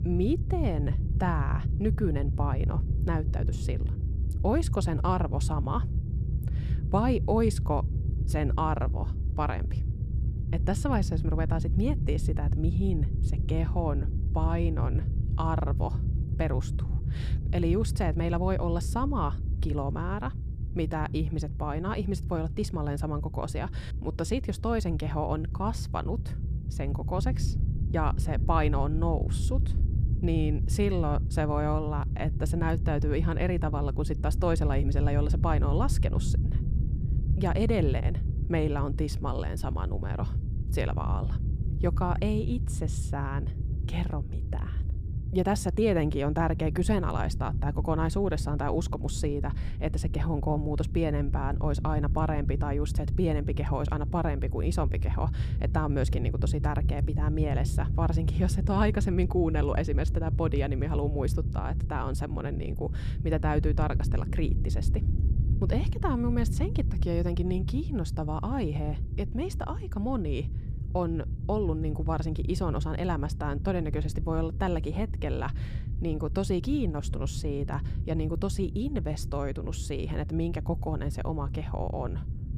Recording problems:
low rumble; noticeable; throughout; 10 dB below the speech

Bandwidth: 15 kHz